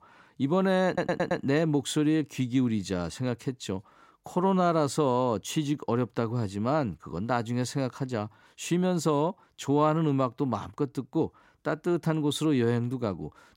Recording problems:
audio stuttering; at 1 s

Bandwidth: 16 kHz